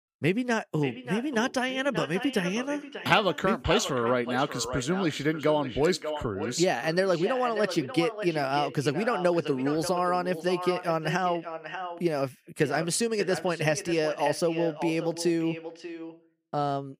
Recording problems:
echo of what is said; strong; throughout; 590 ms later, 10 dB below the speech

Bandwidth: 15 kHz